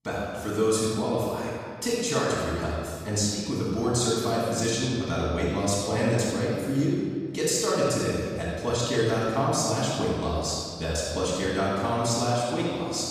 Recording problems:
room echo; strong; dies away in 1.9 s
off-mic speech; far

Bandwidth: 14.5 kHz